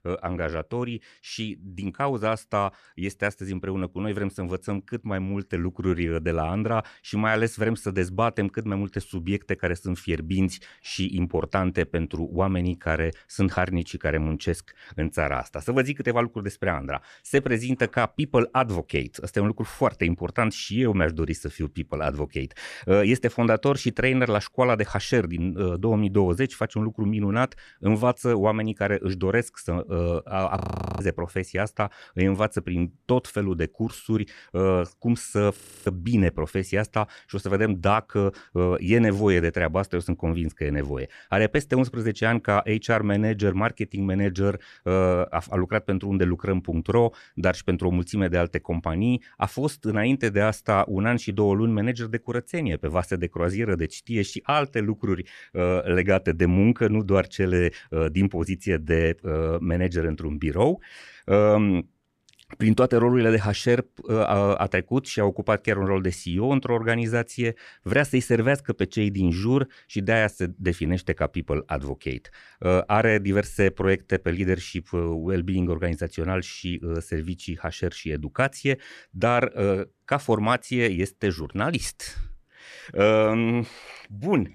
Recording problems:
audio freezing; at 31 s and at 36 s

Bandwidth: 14 kHz